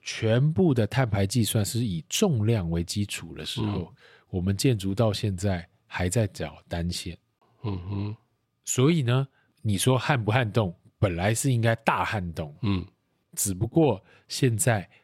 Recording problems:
none

